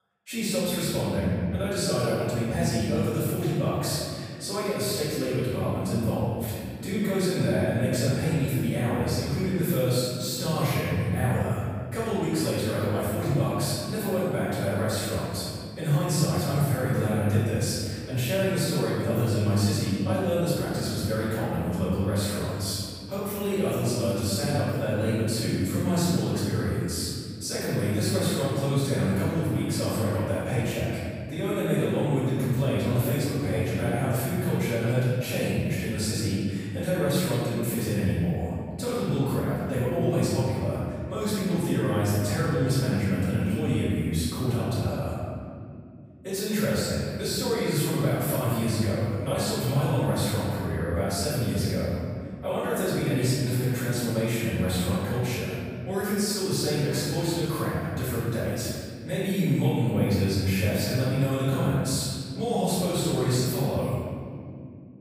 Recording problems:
room echo; strong; dies away in 2.4 s
off-mic speech; far

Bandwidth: 15 kHz